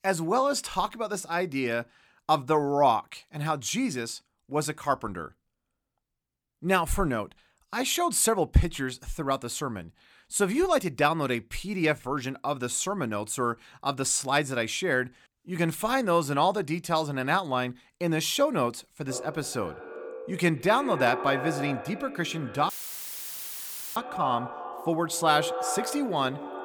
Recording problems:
echo of what is said; strong; from 19 s on; 90 ms later, 9 dB below the speech
audio cutting out; filled with static; at 23 s for 1.5 s

